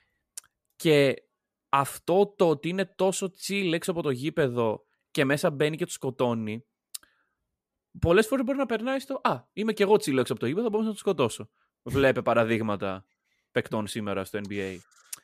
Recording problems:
none

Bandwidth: 14.5 kHz